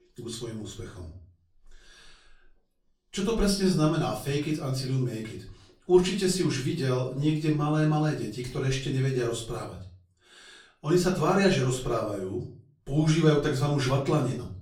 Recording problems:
off-mic speech; far
room echo; slight; dies away in 0.4 s

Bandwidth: 17.5 kHz